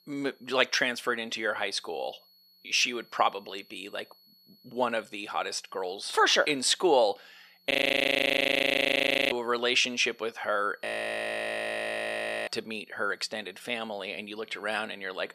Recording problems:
thin; somewhat; fading below 500 Hz
high-pitched whine; faint; throughout; 4.5 kHz, 30 dB below the speech
audio freezing; at 7.5 s for 1.5 s and at 11 s for 1.5 s

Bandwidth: 14.5 kHz